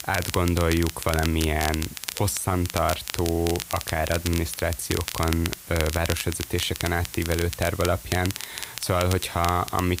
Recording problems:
crackle, like an old record; loud; 8 dB below the speech
hiss; noticeable; throughout; 15 dB below the speech

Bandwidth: 15.5 kHz